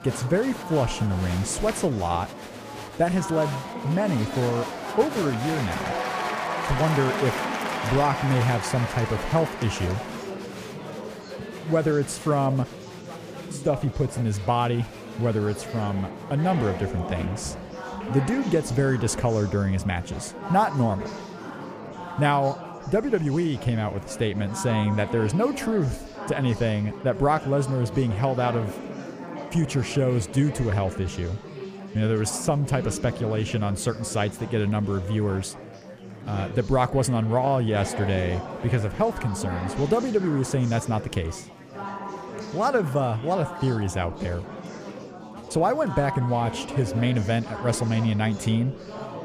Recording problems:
chatter from many people; loud; throughout; 9 dB below the speech

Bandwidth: 15 kHz